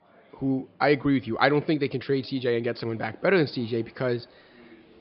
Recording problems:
high frequencies cut off; noticeable; nothing above 5 kHz
murmuring crowd; faint; throughout; 30 dB below the speech

